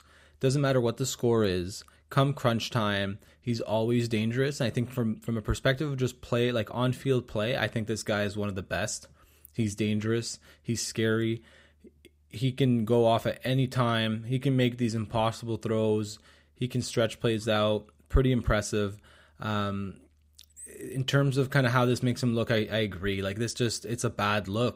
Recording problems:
none

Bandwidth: 15.5 kHz